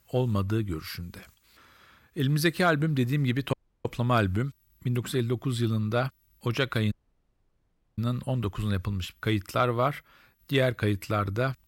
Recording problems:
audio cutting out; at 3.5 s and at 7 s for 1 s

